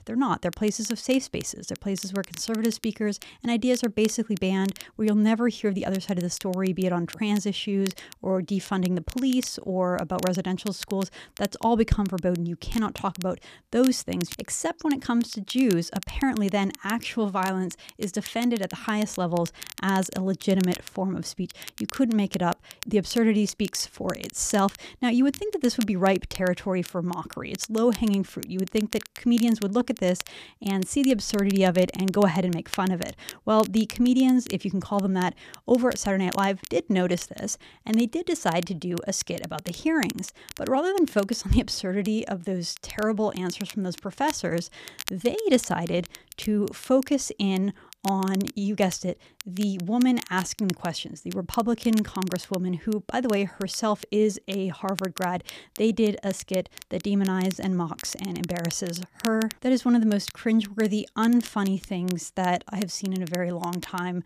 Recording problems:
crackle, like an old record; noticeable; 15 dB below the speech

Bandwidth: 14.5 kHz